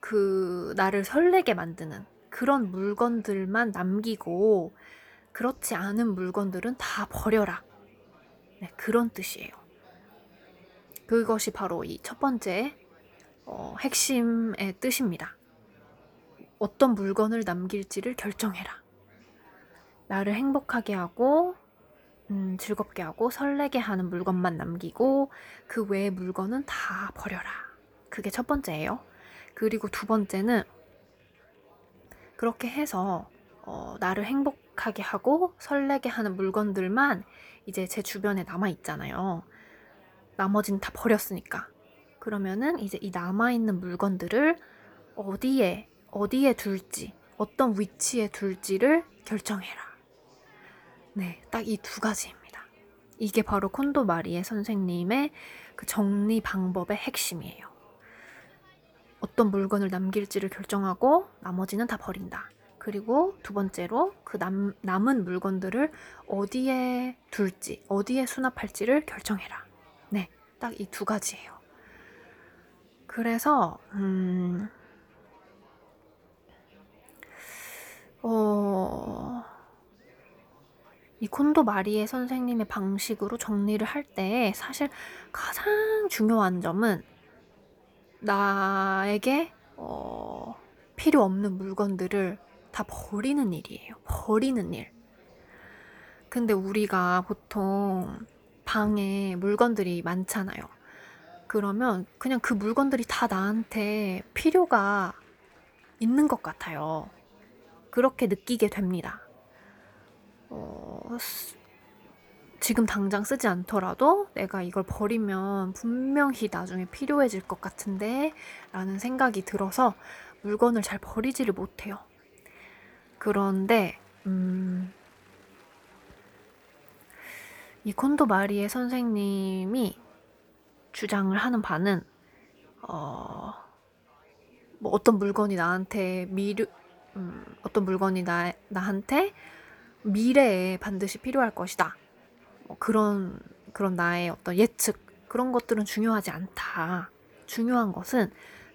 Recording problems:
murmuring crowd; faint; throughout; 30 dB below the speech

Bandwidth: 18.5 kHz